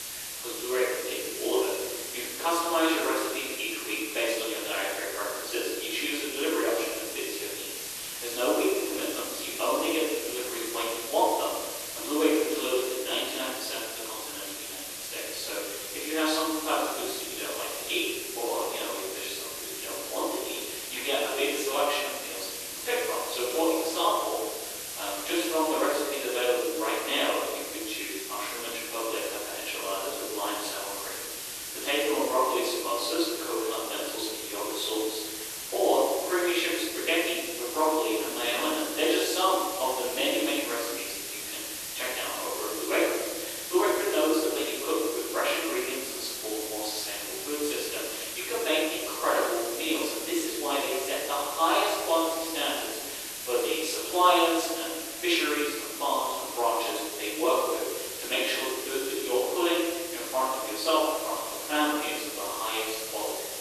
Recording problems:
room echo; strong; dies away in 1.2 s
off-mic speech; far
thin; very; fading below 300 Hz
hiss; loud; throughout; 6 dB below the speech

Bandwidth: 13.5 kHz